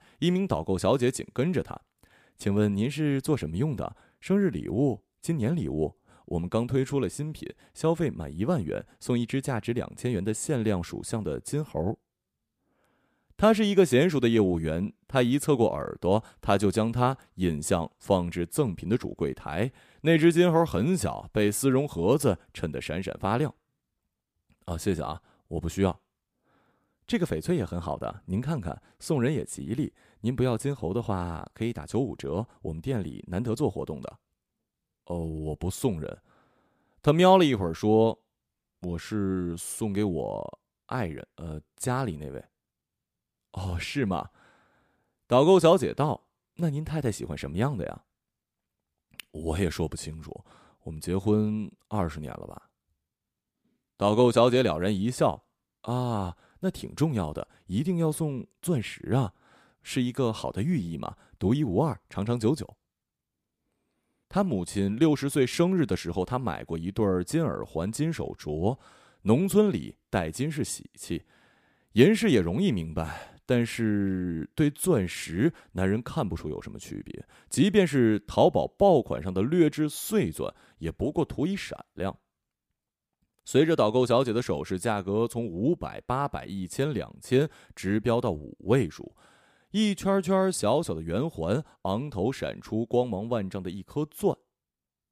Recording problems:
none

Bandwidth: 15 kHz